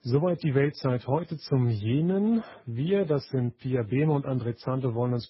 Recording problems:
garbled, watery; badly; nothing above 5.5 kHz

